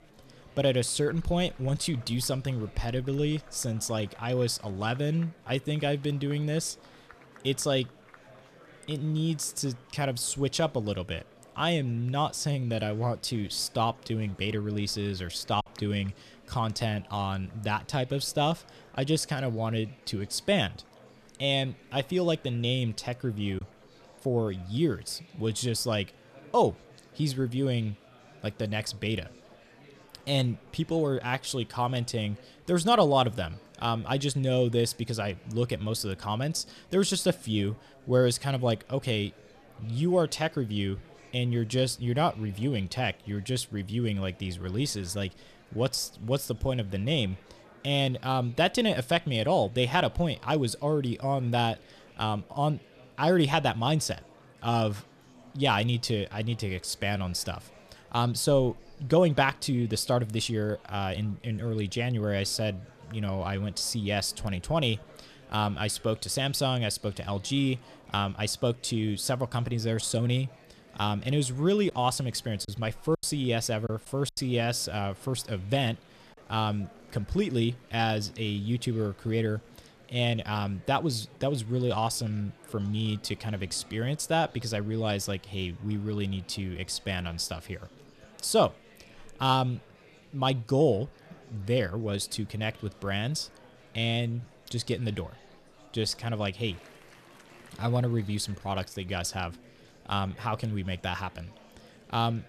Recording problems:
murmuring crowd; faint; throughout; 25 dB below the speech
choppy; occasionally; at 16 s and from 1:12 to 1:14; 3% of the speech affected

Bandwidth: 13.5 kHz